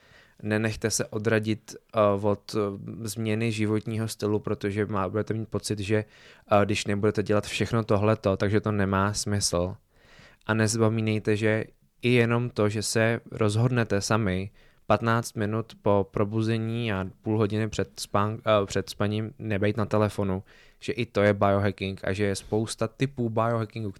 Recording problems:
none

